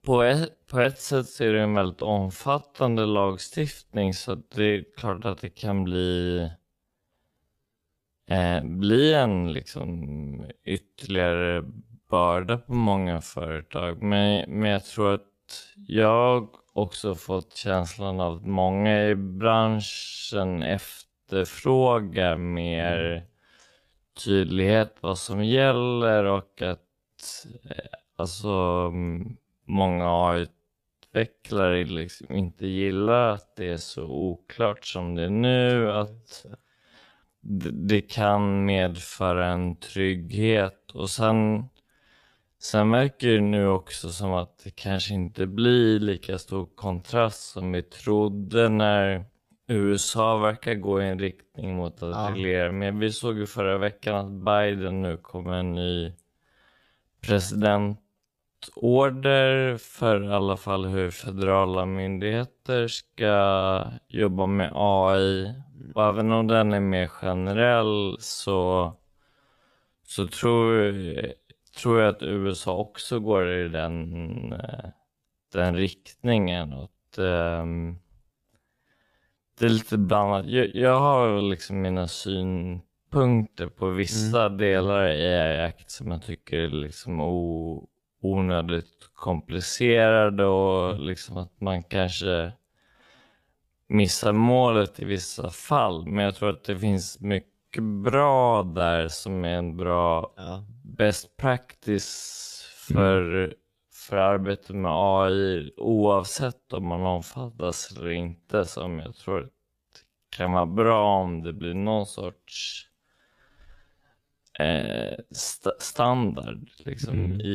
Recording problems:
wrong speed, natural pitch; too slow; 0.5 times normal speed
abrupt cut into speech; at the end

